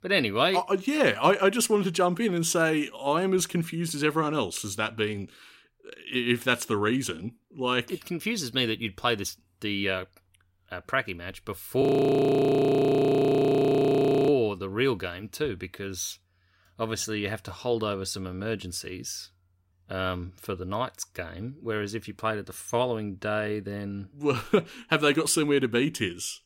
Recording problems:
audio freezing; at 12 s for 2.5 s

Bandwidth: 16 kHz